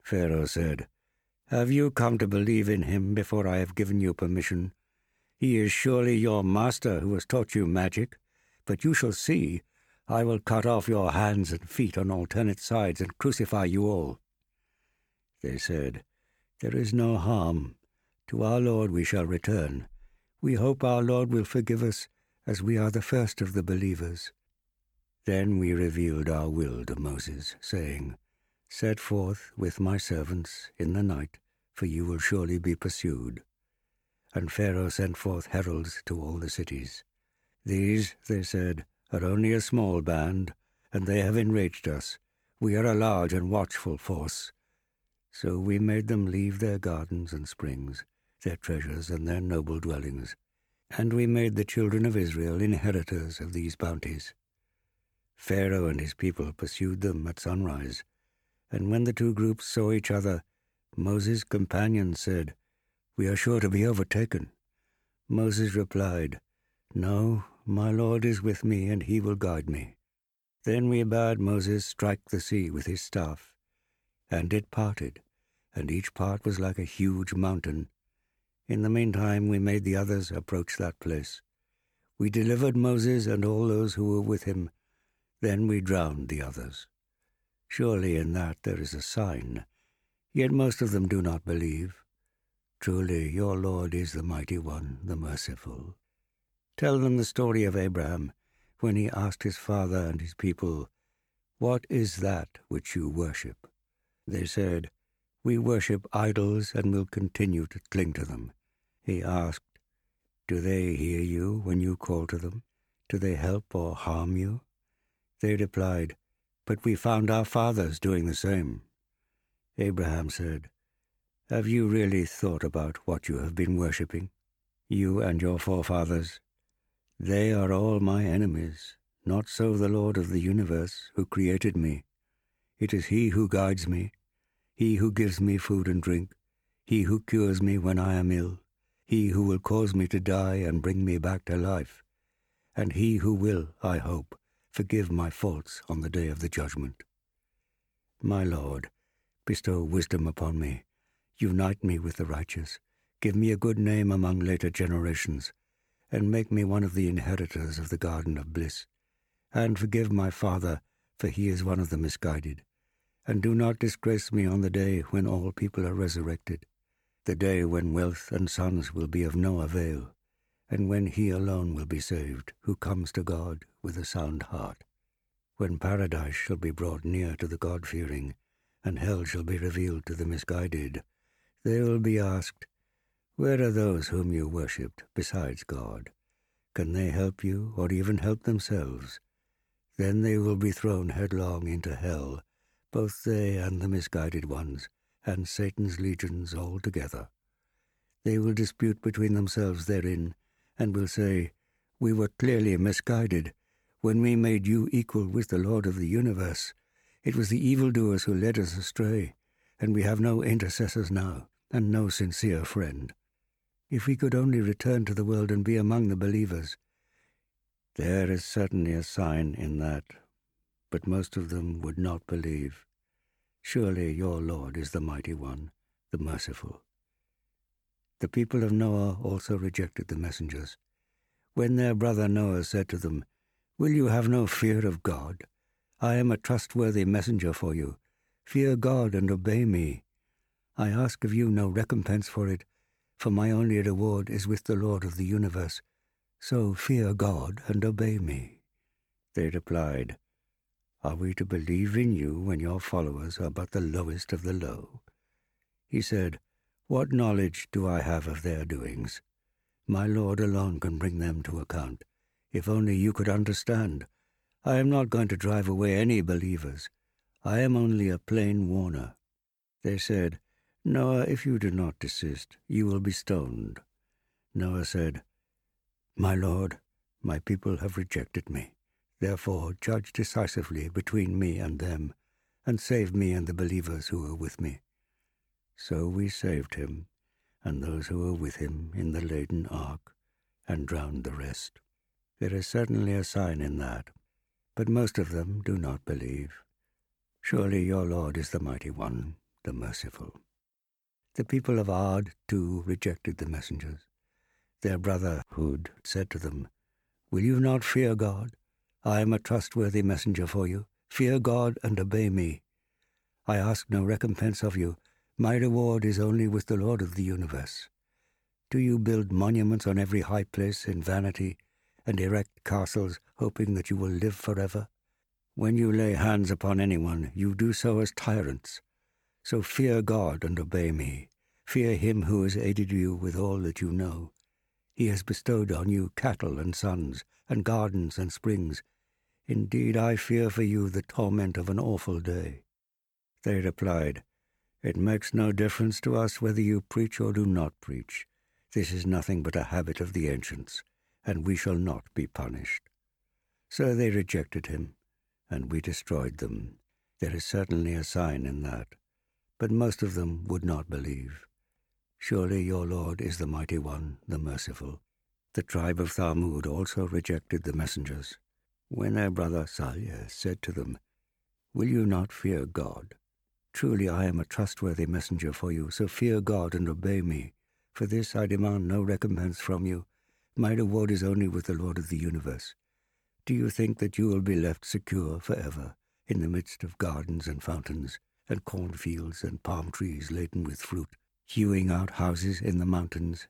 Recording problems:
none

